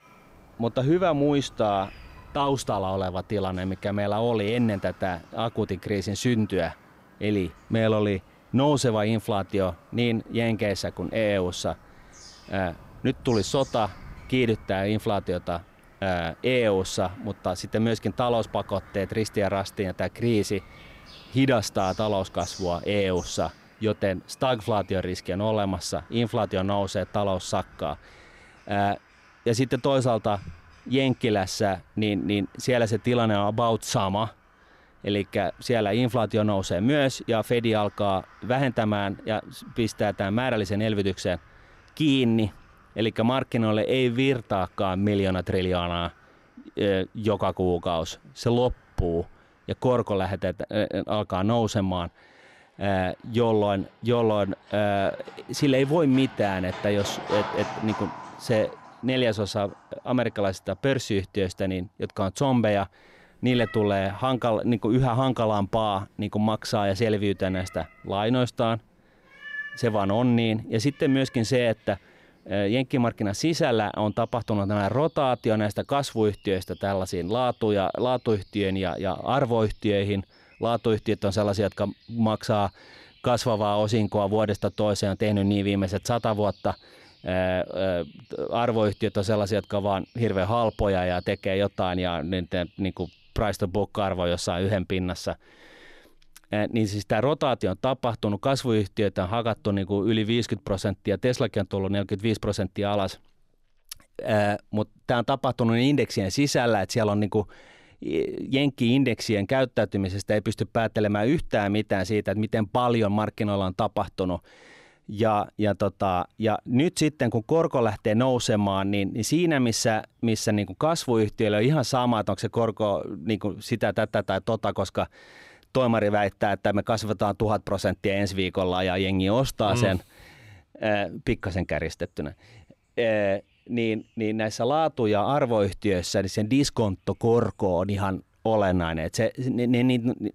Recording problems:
animal sounds; faint; throughout; 20 dB below the speech

